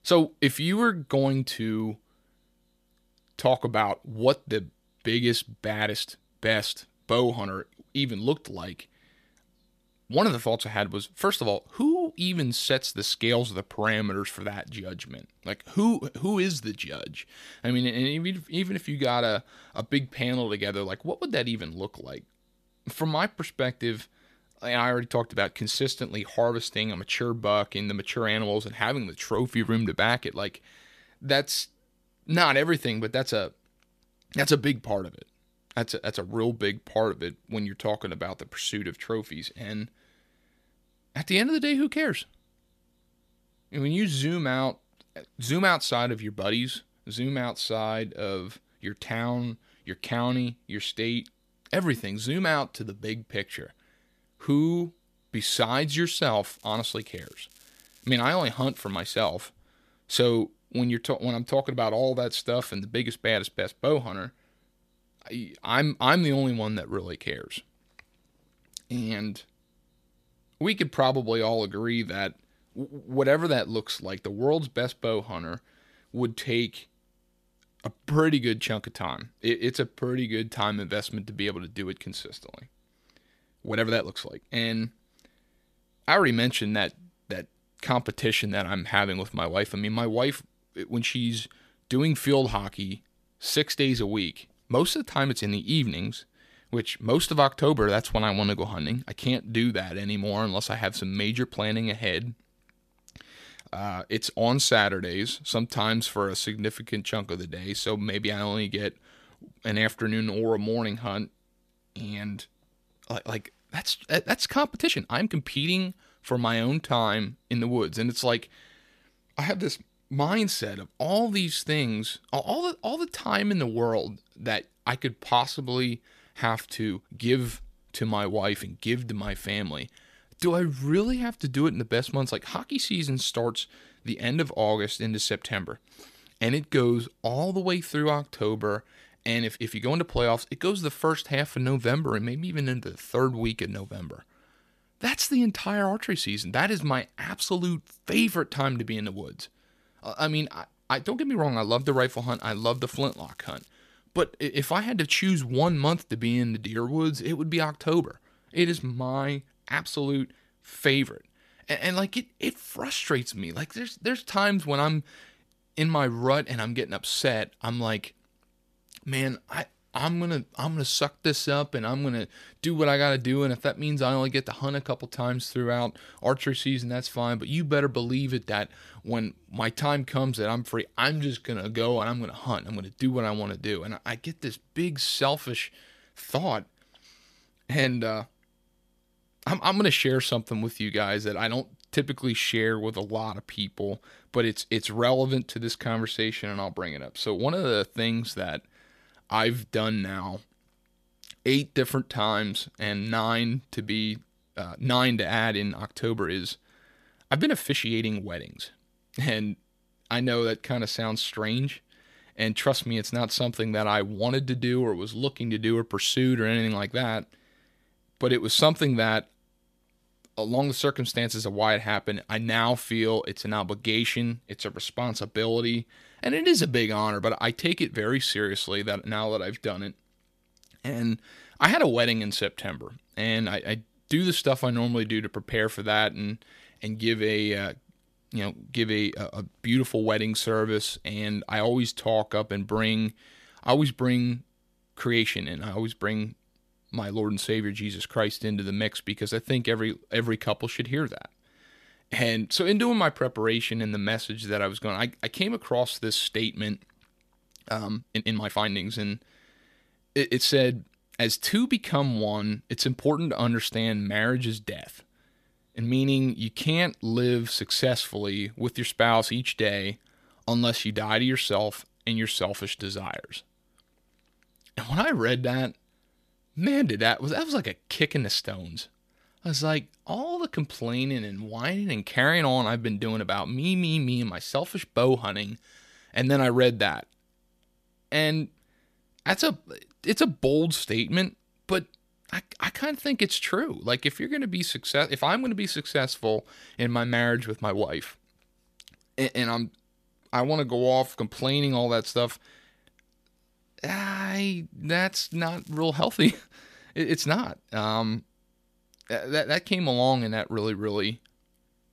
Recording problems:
crackling; faint; from 56 to 59 s, from 2:32 to 2:34 and at 5:05; 25 dB below the speech
uneven, jittery; strongly; from 5.5 s to 5:01

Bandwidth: 14.5 kHz